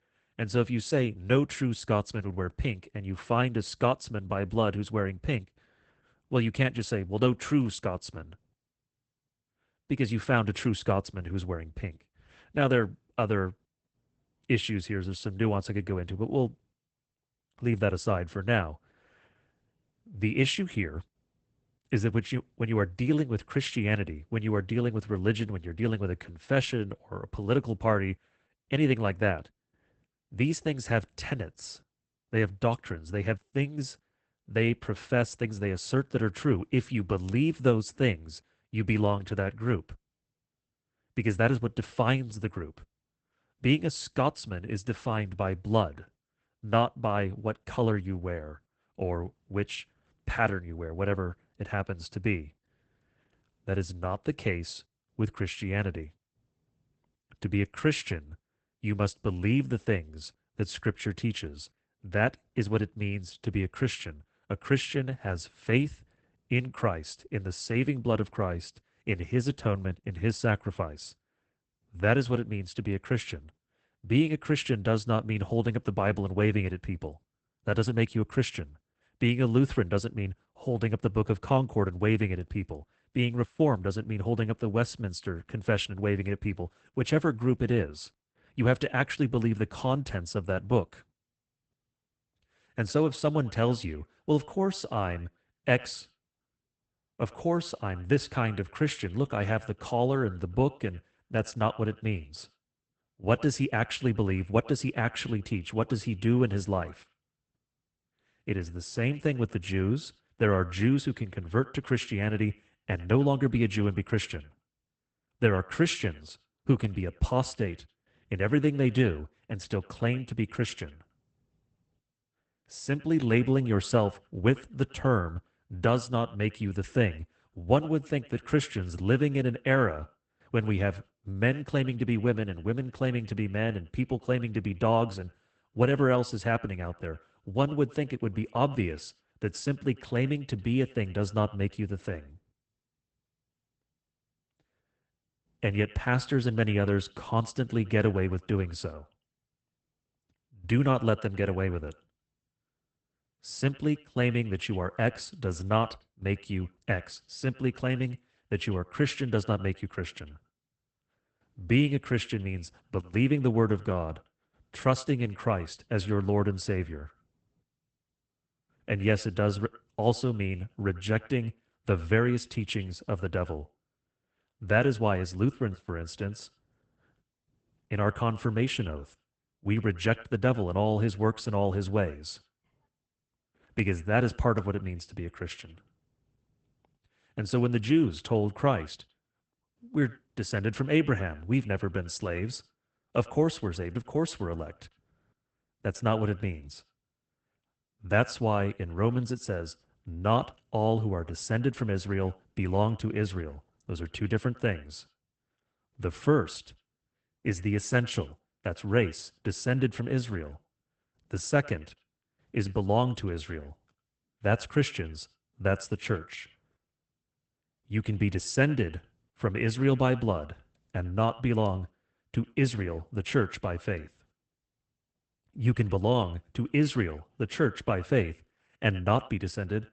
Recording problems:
garbled, watery; badly; nothing above 8 kHz
echo of what is said; faint; from 1:32 on; 100 ms later, 25 dB below the speech

